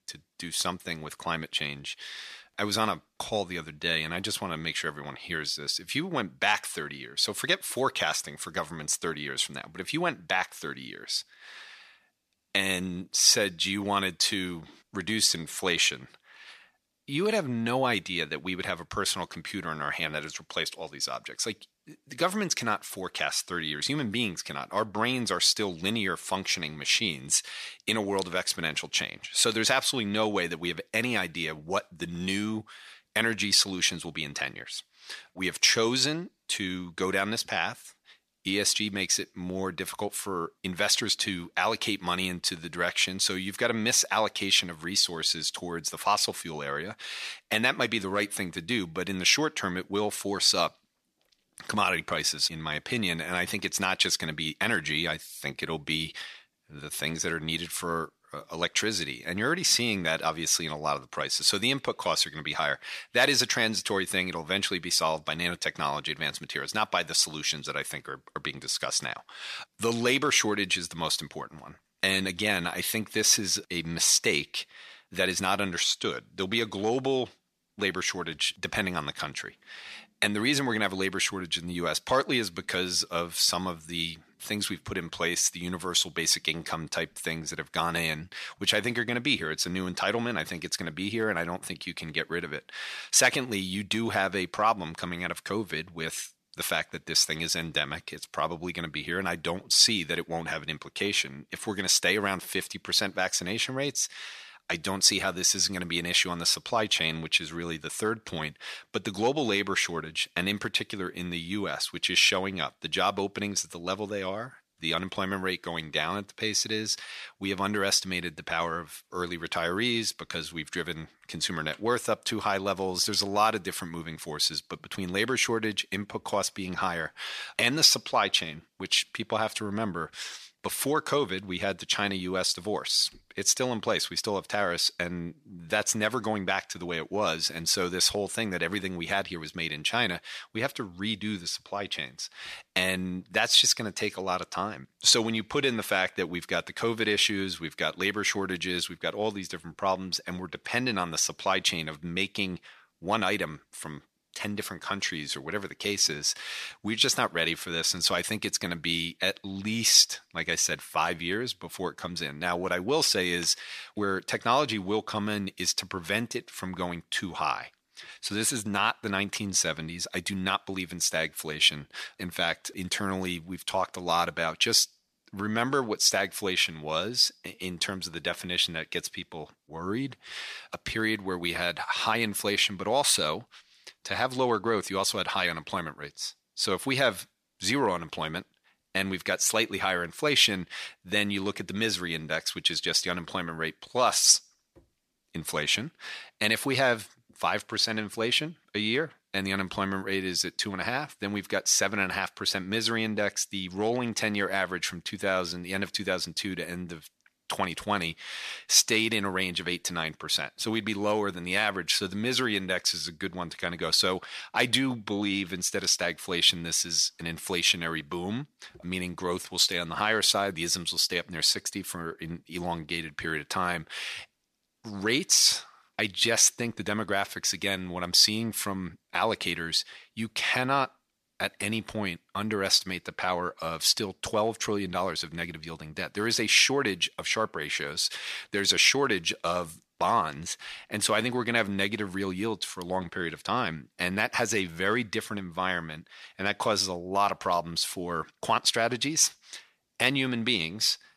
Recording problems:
thin; somewhat; fading below 1 kHz

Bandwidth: 14.5 kHz